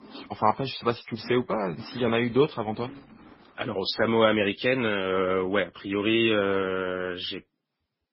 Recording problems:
garbled, watery; badly; nothing above 5.5 kHz
household noises; faint; throughout; 20 dB below the speech

